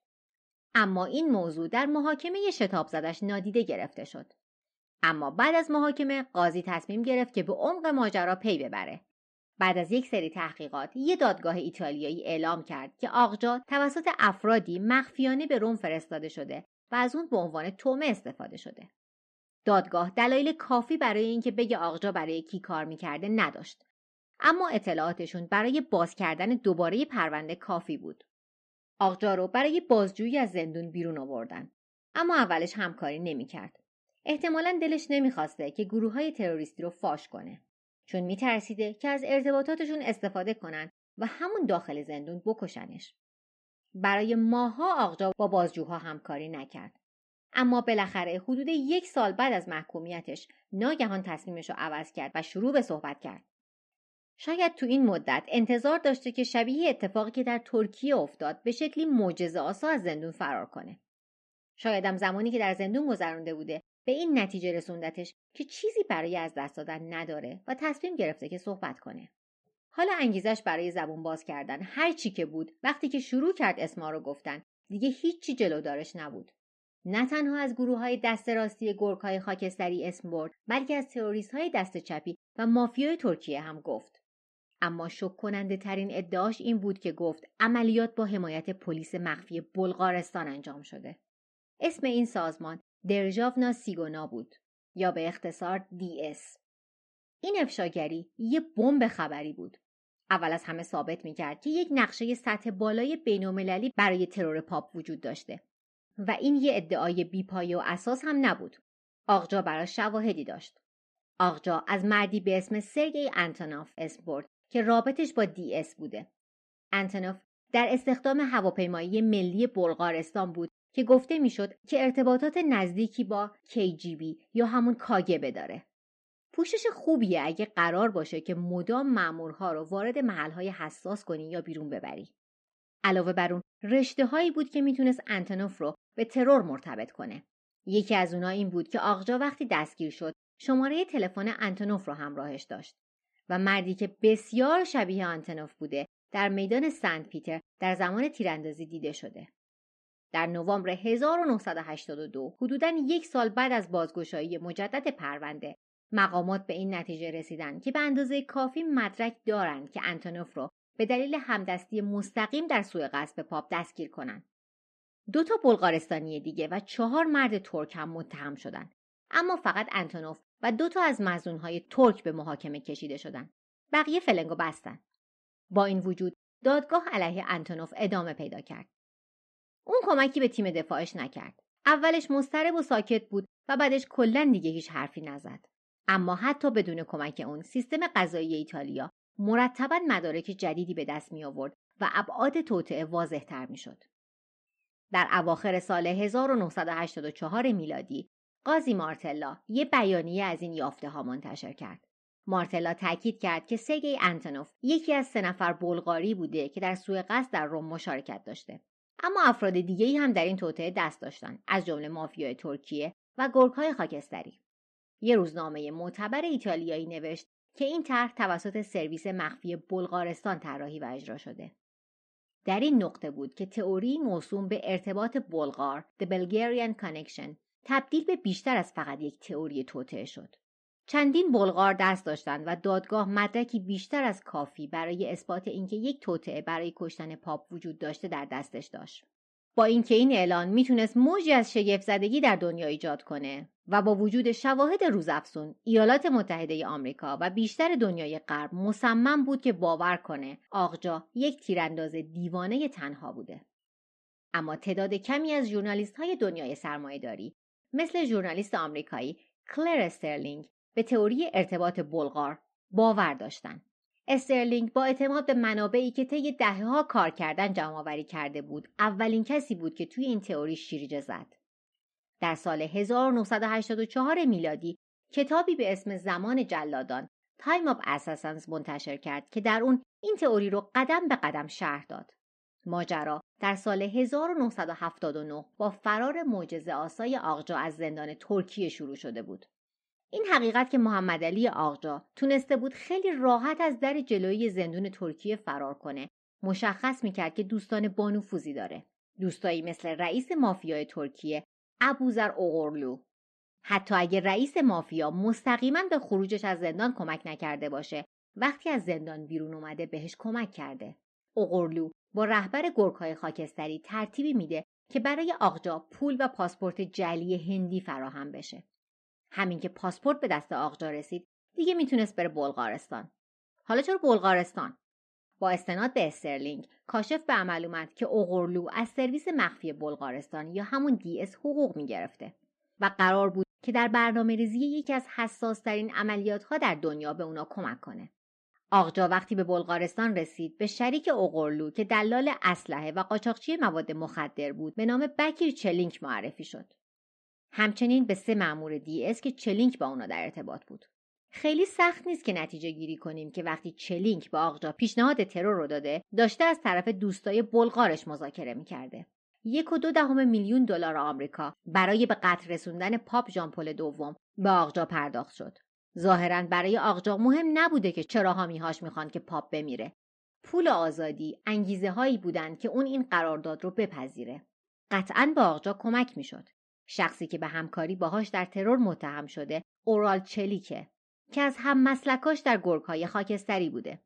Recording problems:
muffled; slightly; fading above 3 kHz

